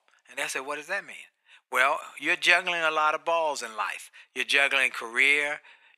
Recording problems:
thin; very; fading below 700 Hz

